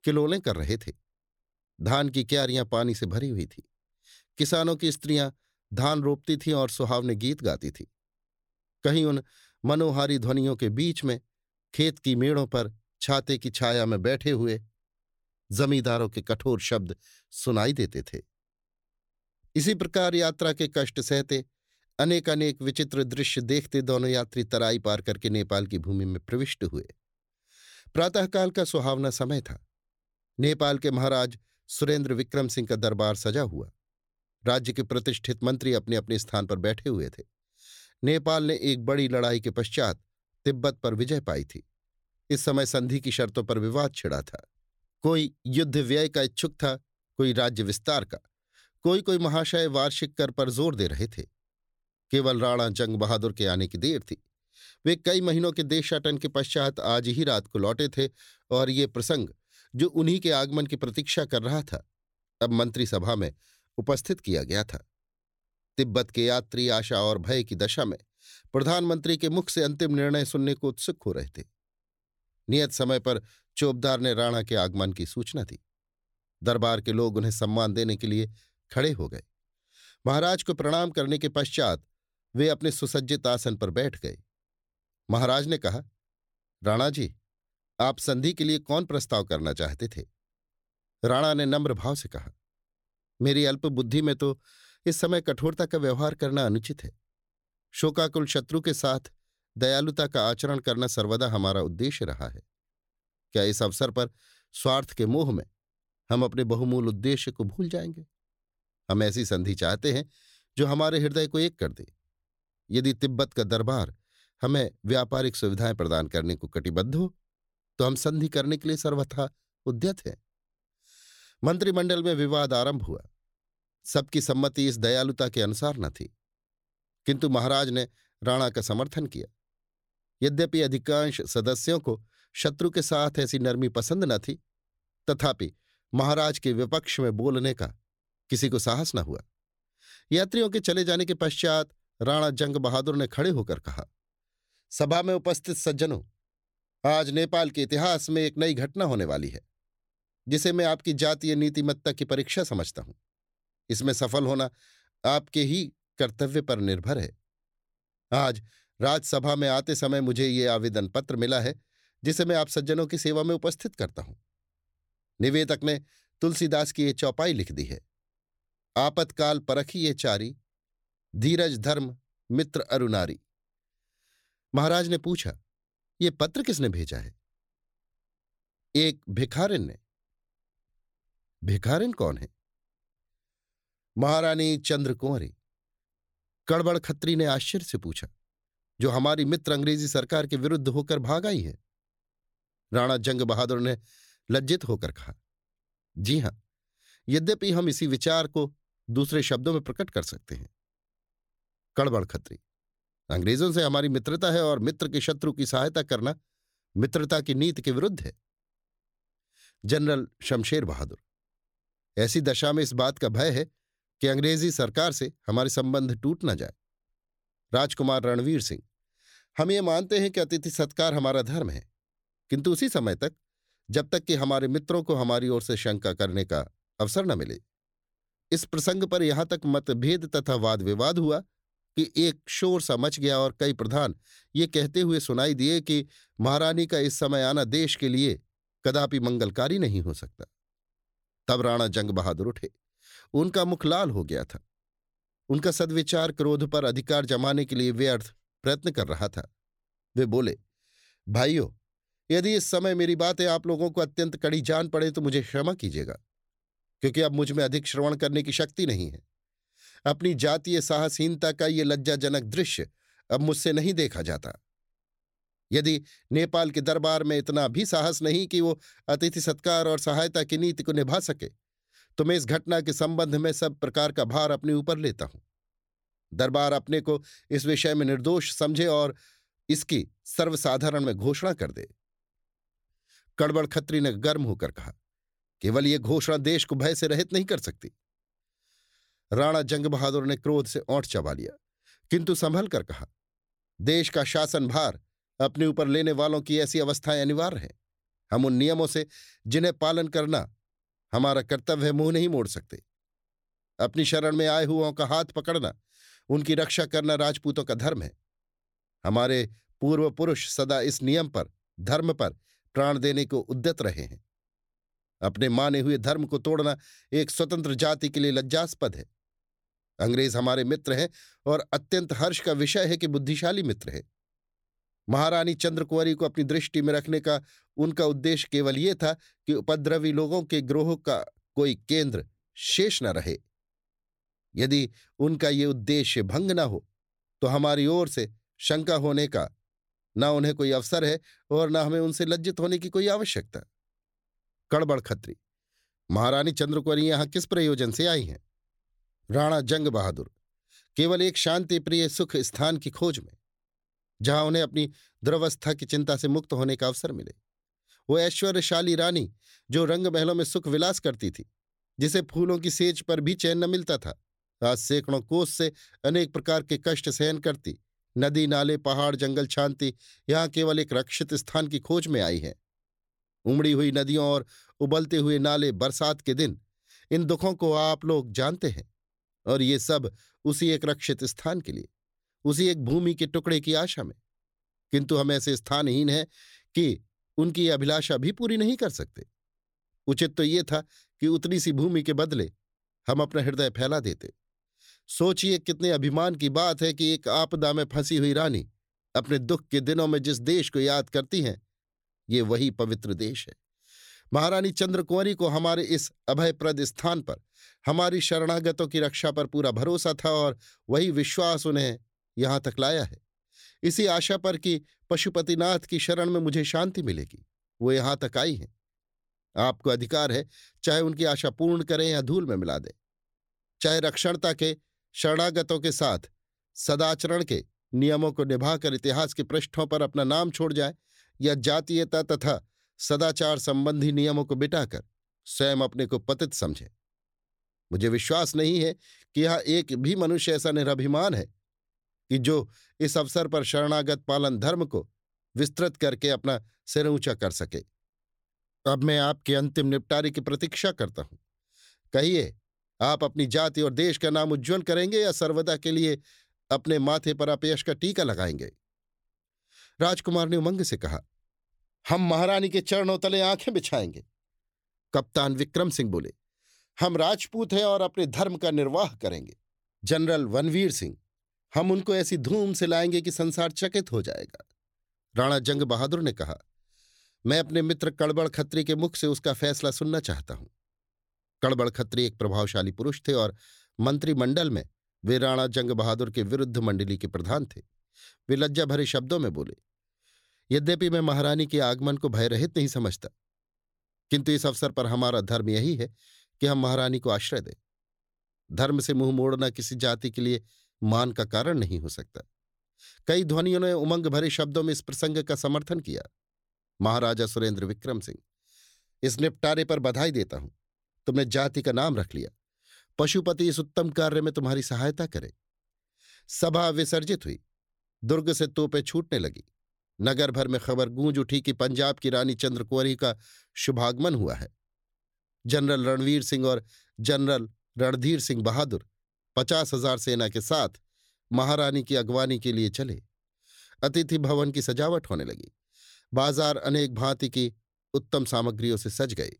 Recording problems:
none

